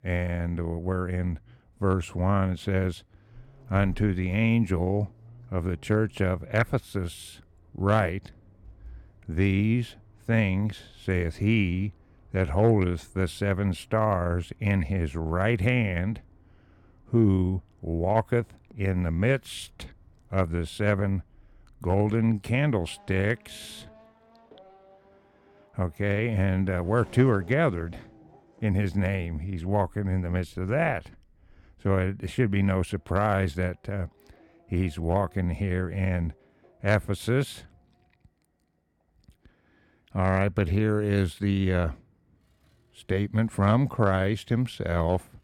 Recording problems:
traffic noise; faint; throughout; 30 dB below the speech

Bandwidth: 17.5 kHz